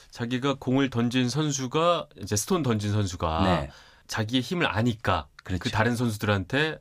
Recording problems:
none

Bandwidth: 15 kHz